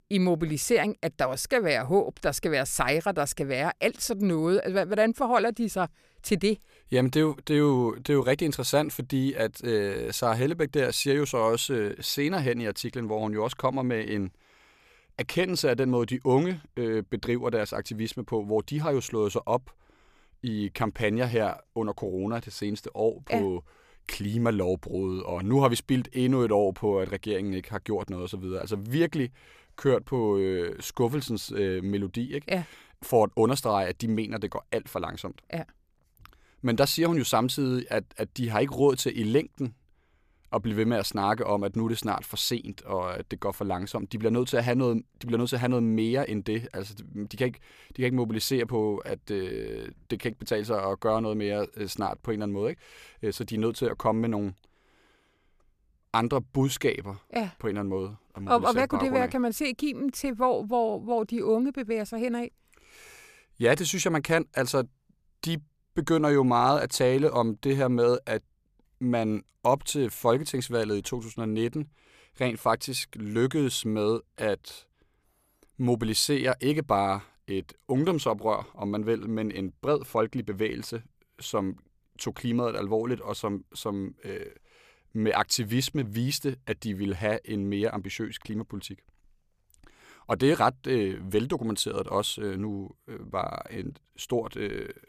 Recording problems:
none

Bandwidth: 14.5 kHz